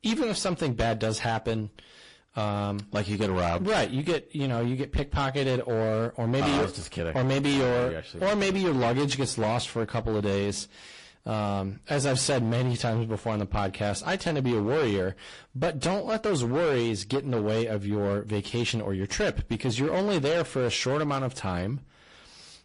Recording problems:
distortion; heavy; 18% of the sound clipped
garbled, watery; slightly; nothing above 10.5 kHz

